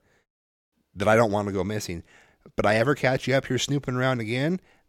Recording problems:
none

